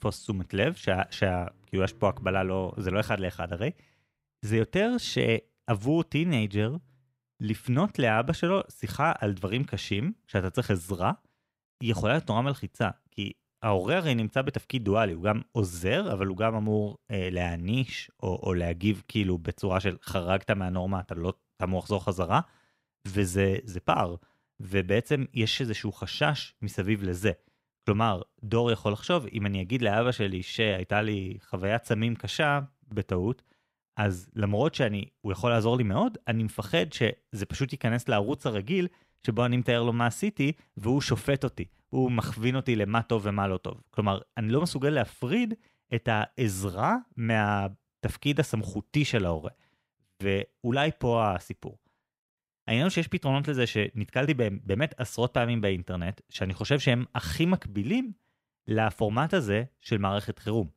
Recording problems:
none

